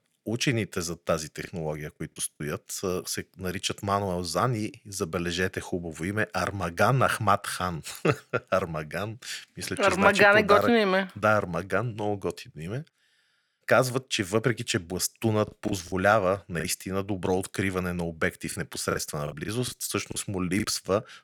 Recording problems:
choppy; very; at 1.5 s, from 15 to 17 s and from 19 to 21 s; 10% of the speech affected

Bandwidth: 18.5 kHz